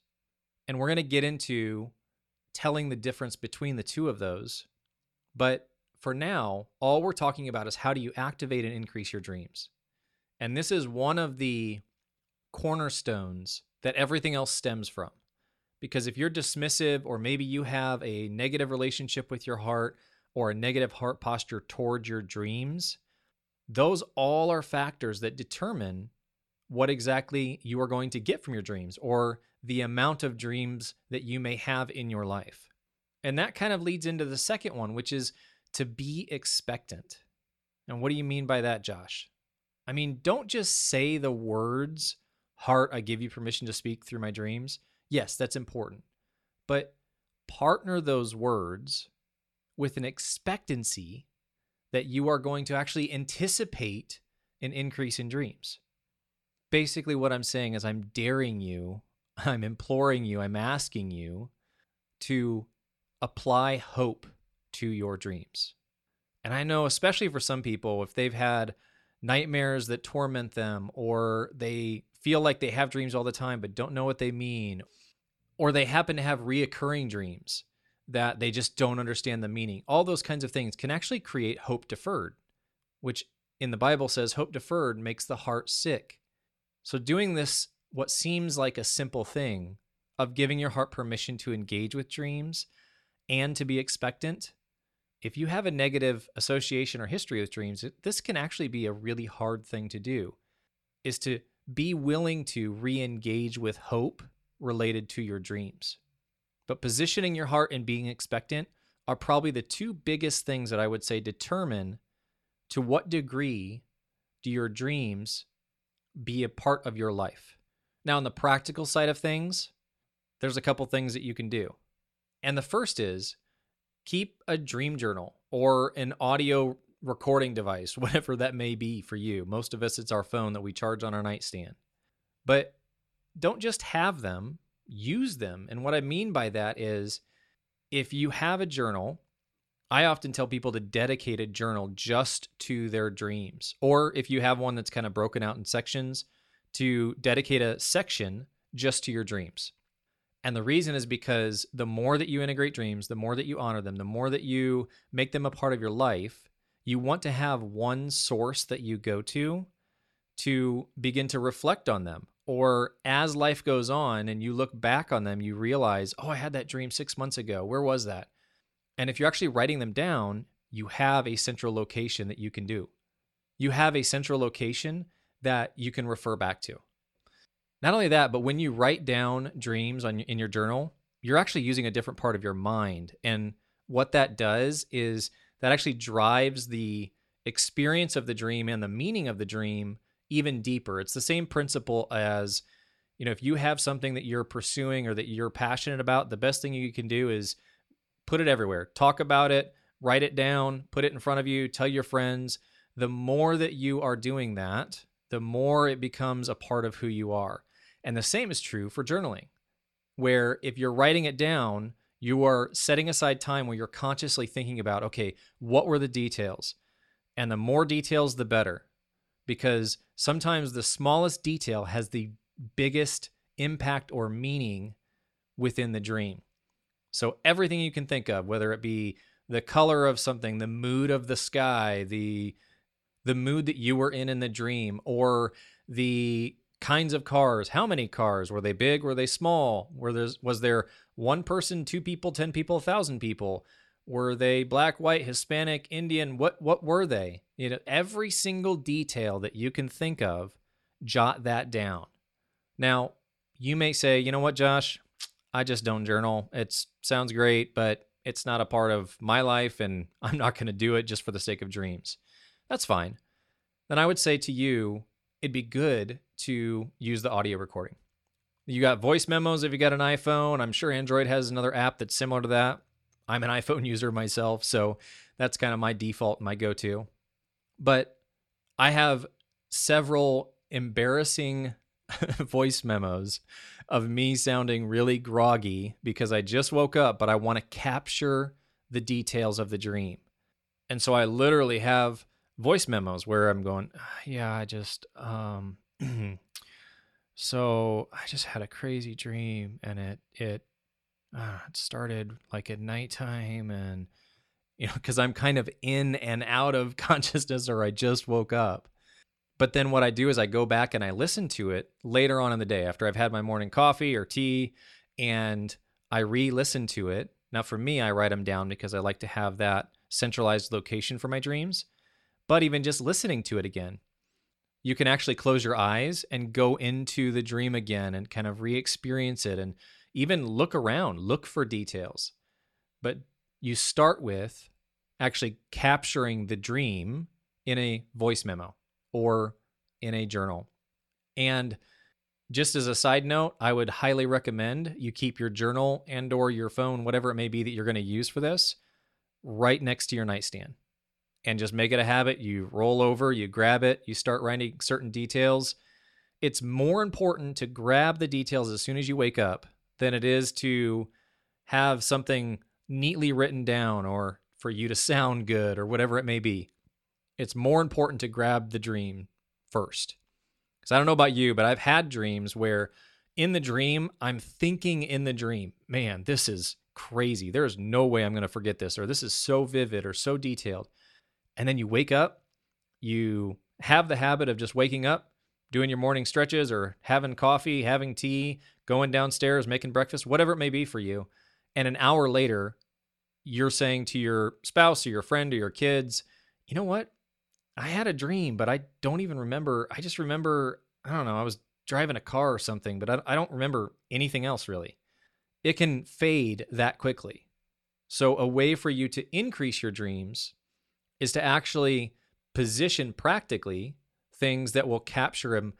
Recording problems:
none

